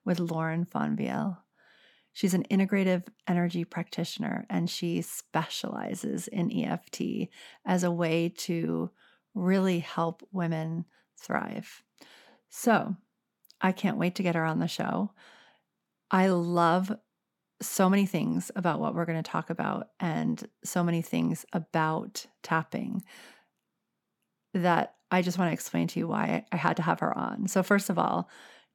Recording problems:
none

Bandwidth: 17.5 kHz